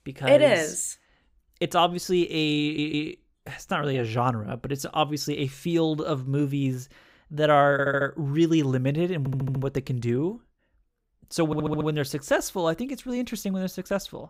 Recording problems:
audio stuttering; 4 times, first at 2.5 s

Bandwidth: 15.5 kHz